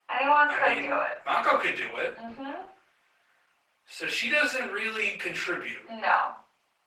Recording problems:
off-mic speech; far
thin; very; fading below 750 Hz
room echo; slight; dies away in 0.4 s
garbled, watery; slightly; nothing above 18.5 kHz

